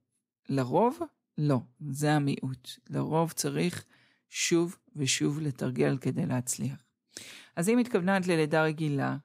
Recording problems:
none

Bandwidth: 15.5 kHz